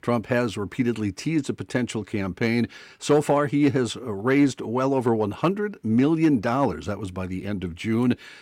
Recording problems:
none

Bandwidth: 16.5 kHz